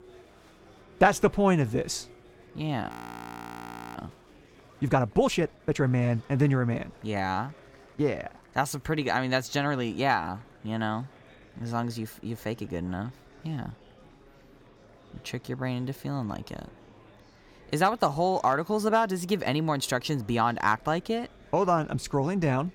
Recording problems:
murmuring crowd; faint; throughout; 25 dB below the speech
audio freezing; at 3 s for 1 s

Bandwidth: 17 kHz